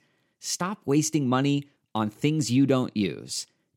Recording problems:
none

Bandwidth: 16 kHz